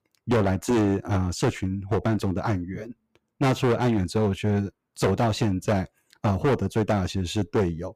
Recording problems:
distortion; heavy; 12% of the sound clipped

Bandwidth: 15.5 kHz